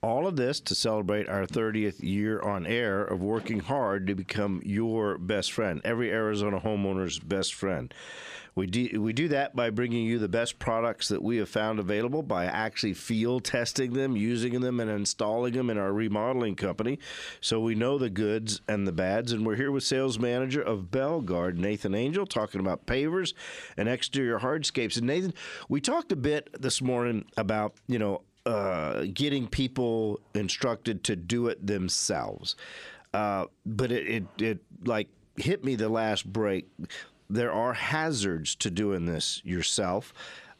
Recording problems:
squashed, flat; somewhat

